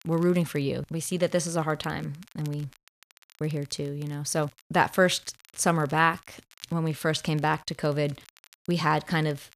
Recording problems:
crackle, like an old record; faint; 25 dB below the speech

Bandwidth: 14.5 kHz